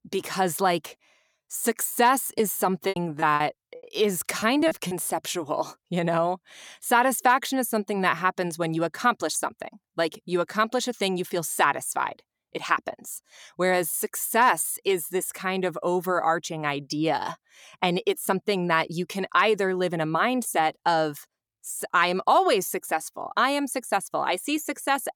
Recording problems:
choppy; very; from 2 to 5 s; 11% of the speech affected

